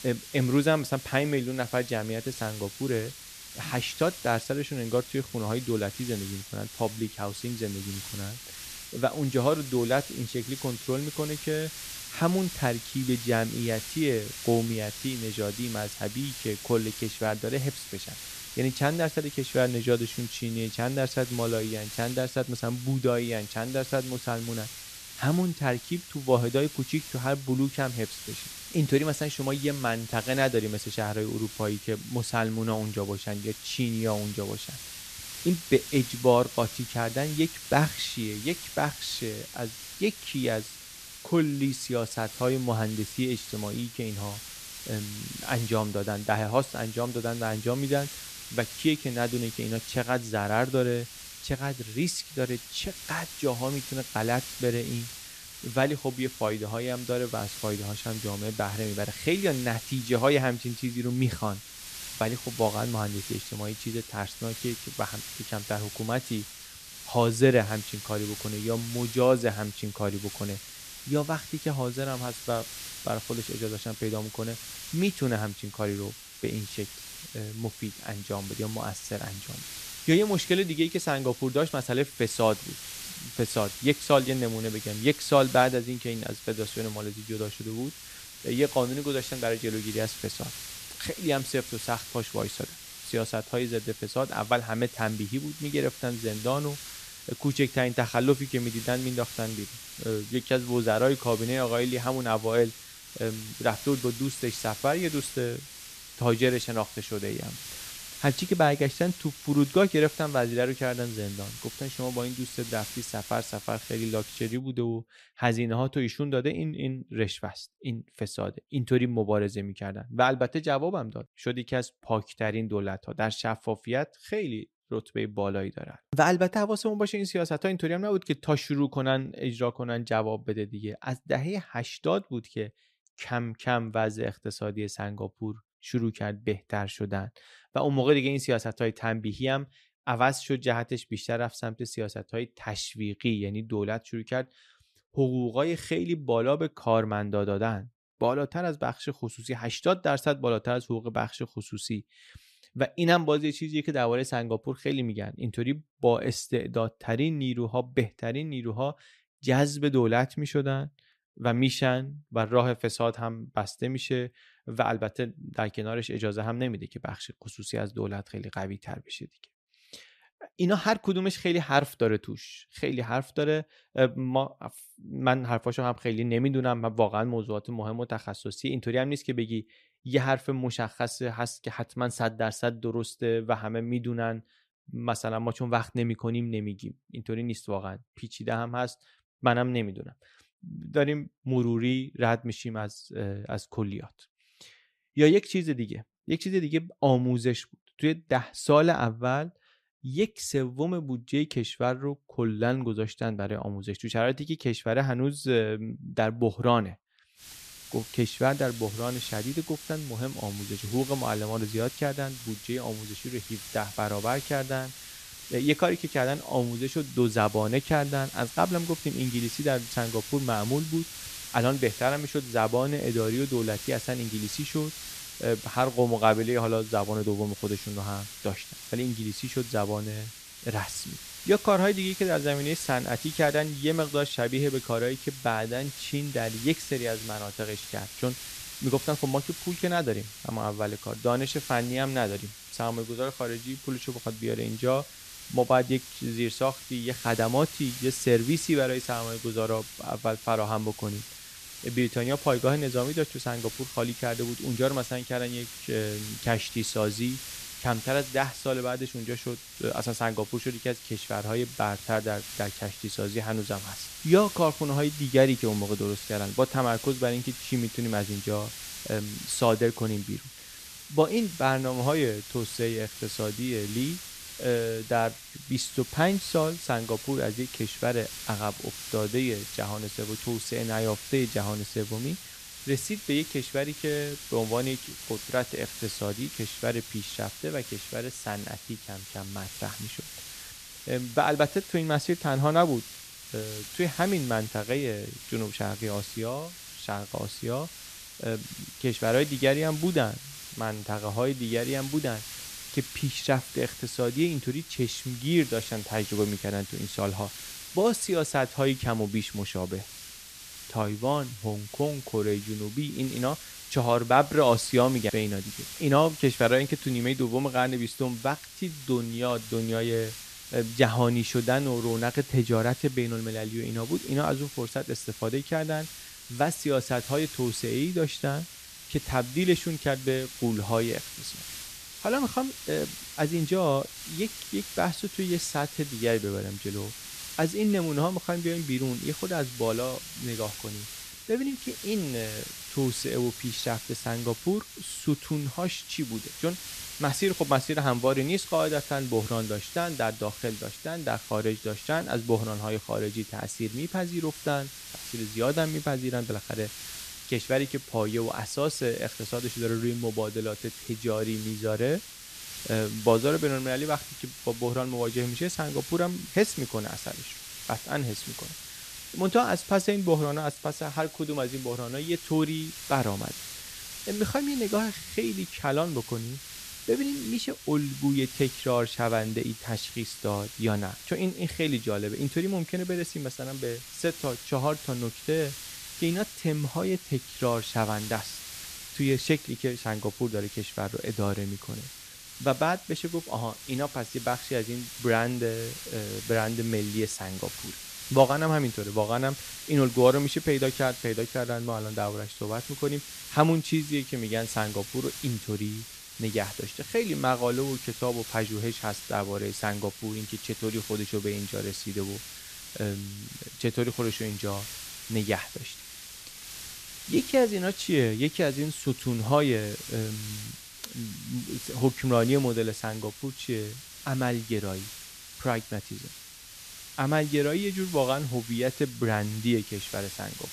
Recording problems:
hiss; noticeable; until 1:55 and from 3:27 on; 10 dB below the speech

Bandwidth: 14.5 kHz